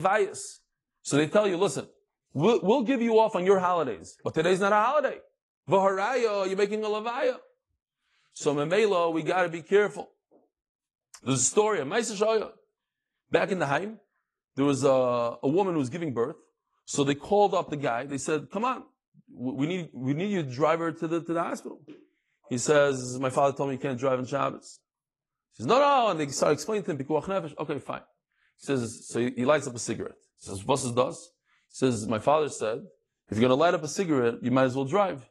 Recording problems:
garbled, watery; slightly
abrupt cut into speech; at the start

